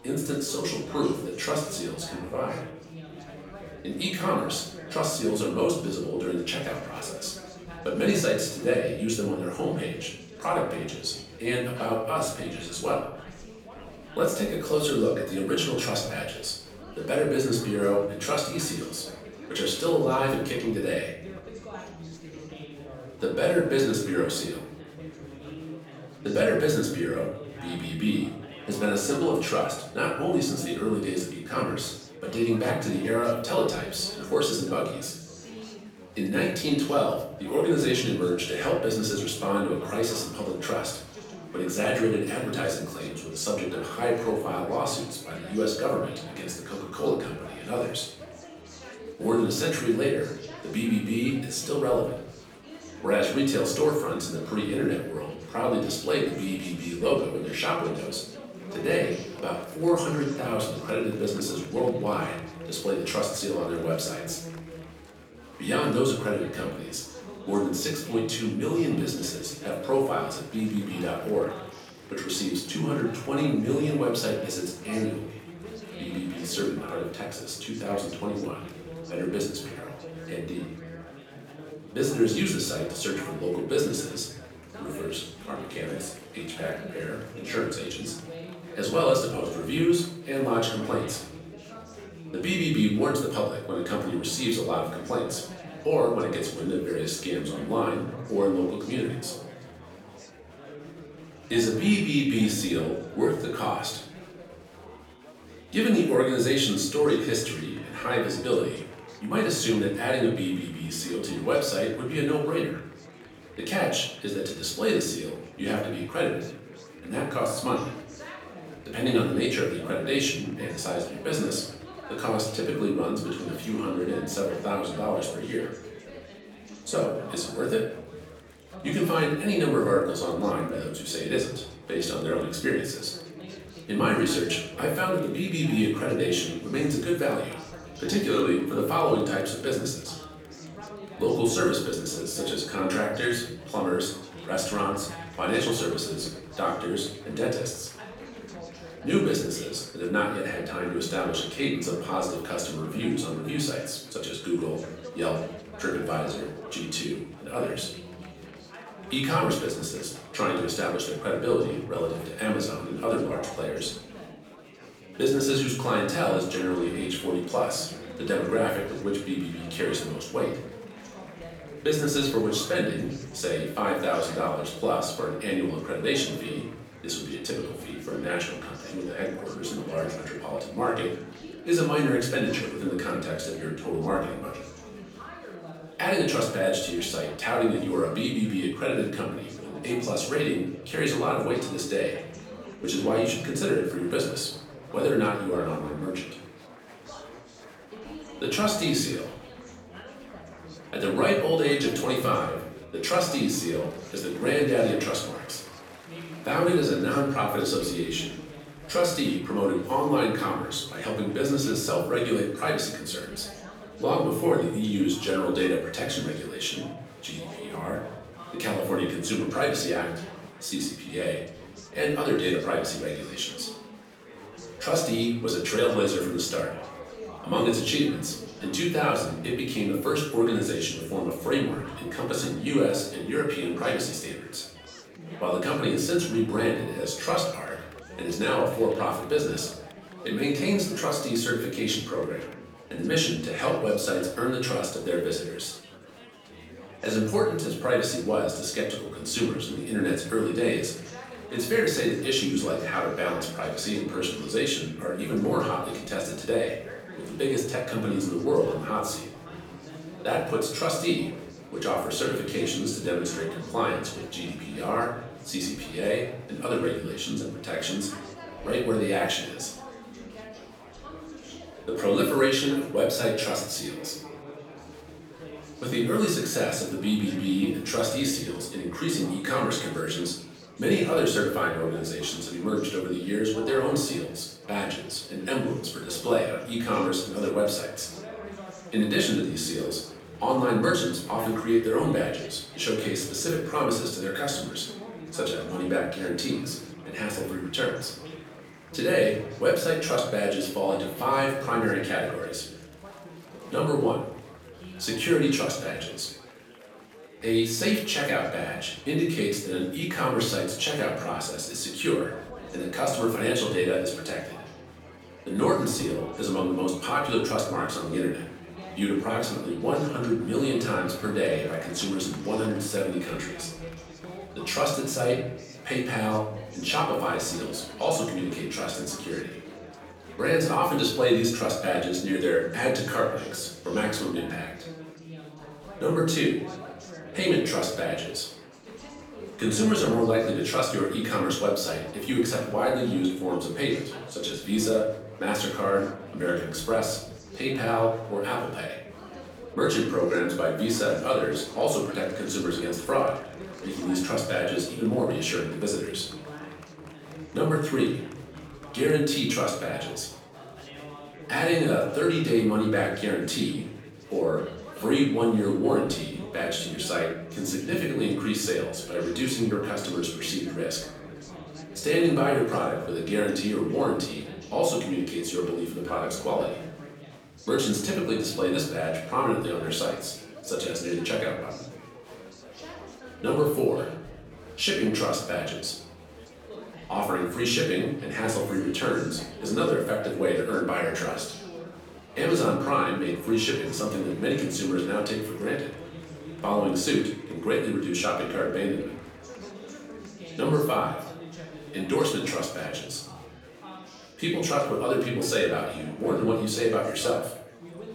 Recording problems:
off-mic speech; far
room echo; noticeable; dies away in 0.6 s
chatter from many people; noticeable; throughout; 15 dB below the speech

